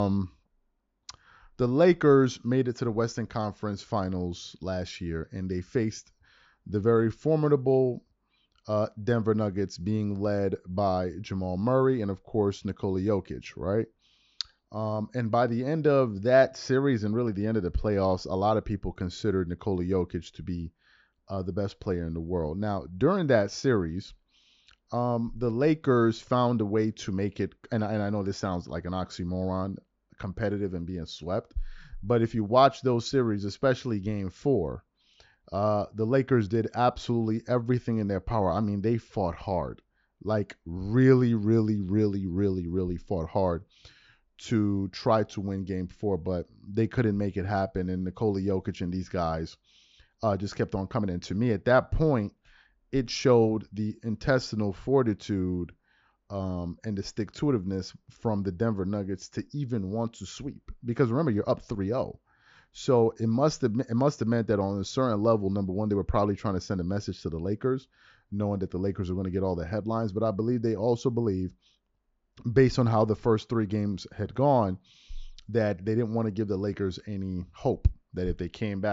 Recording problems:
high frequencies cut off; noticeable; nothing above 7.5 kHz
abrupt cut into speech; at the start and the end

